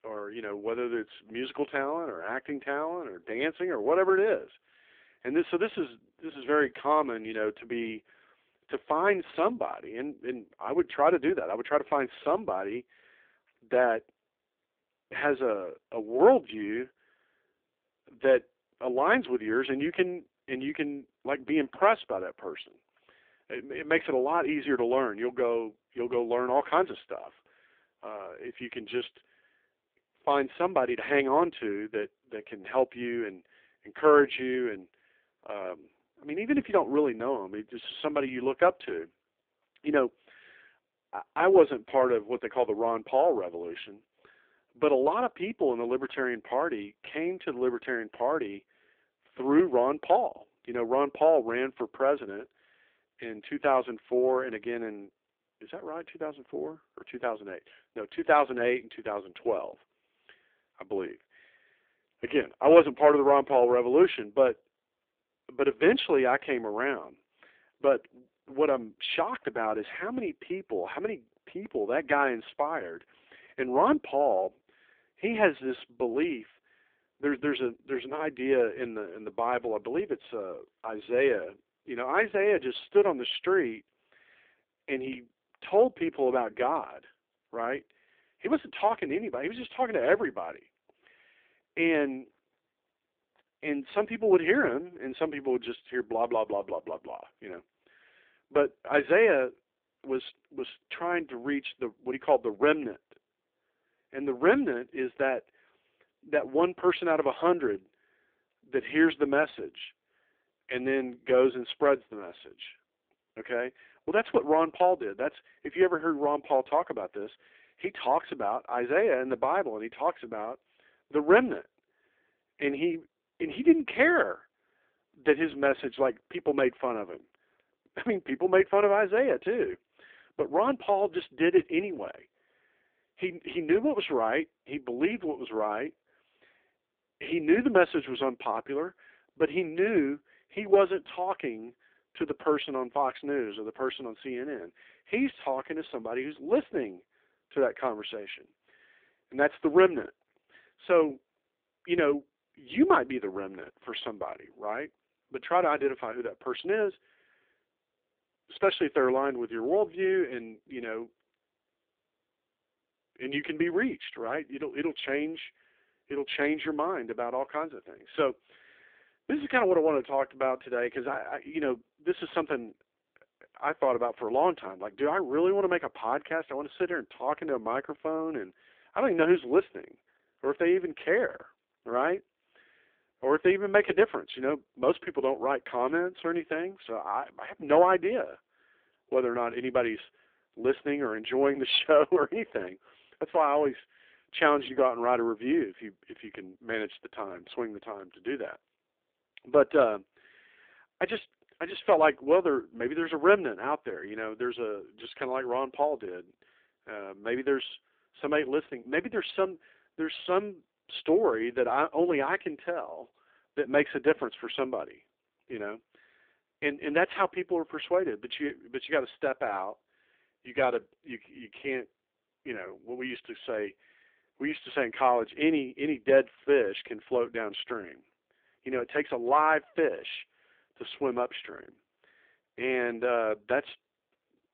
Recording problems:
phone-call audio; poor line; nothing above 3.5 kHz

